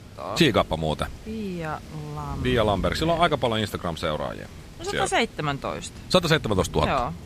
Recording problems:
rain or running water; noticeable; throughout; 15 dB below the speech

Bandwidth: 15 kHz